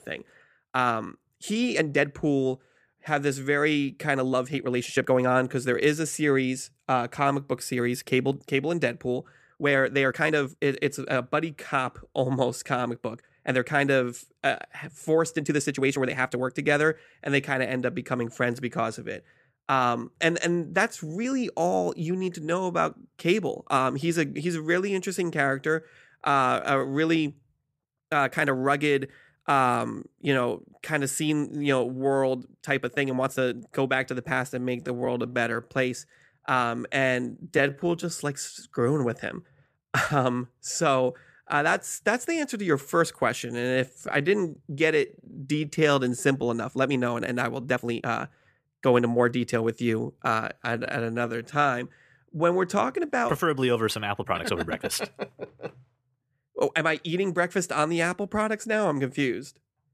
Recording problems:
uneven, jittery; strongly; from 1.5 to 55 s

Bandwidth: 14.5 kHz